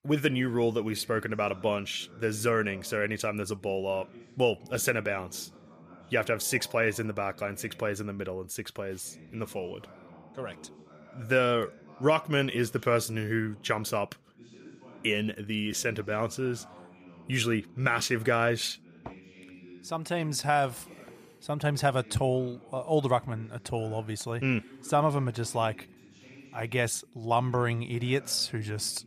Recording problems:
voice in the background; faint; throughout; 20 dB below the speech

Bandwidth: 15 kHz